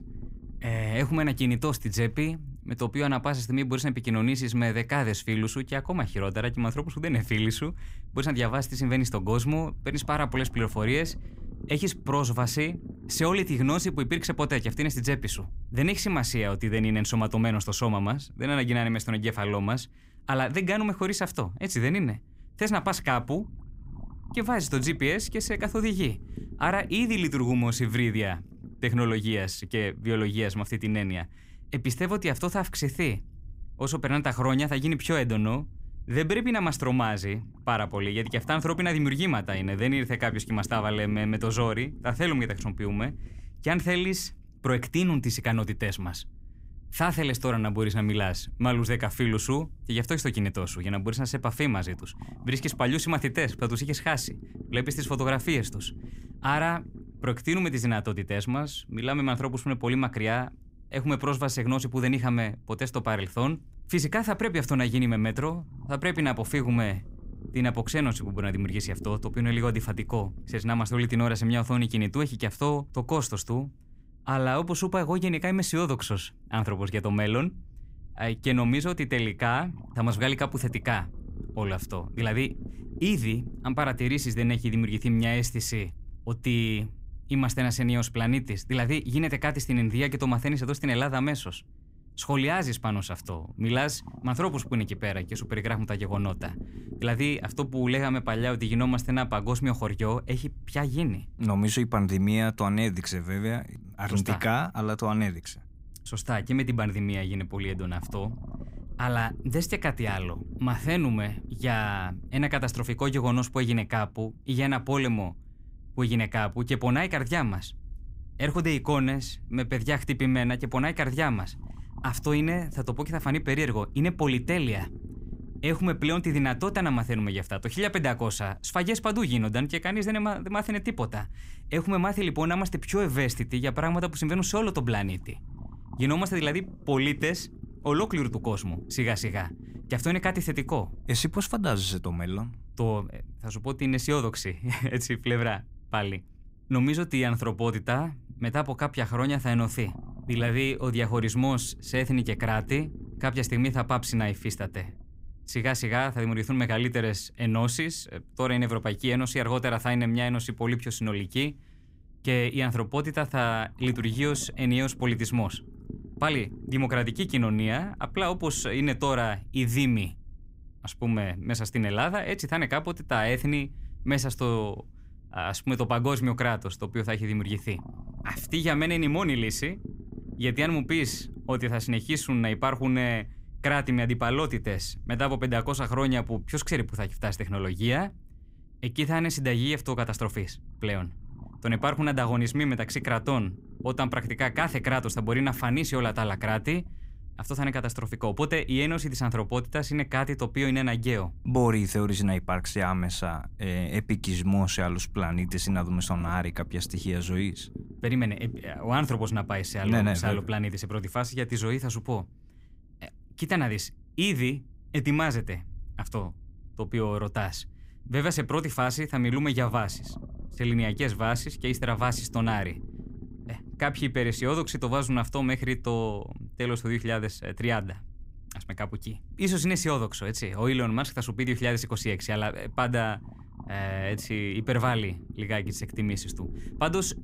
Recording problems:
low rumble; faint; throughout; 25 dB below the speech

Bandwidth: 15.5 kHz